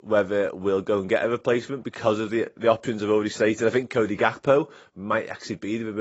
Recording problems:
garbled, watery; badly; nothing above 7.5 kHz
abrupt cut into speech; at the end

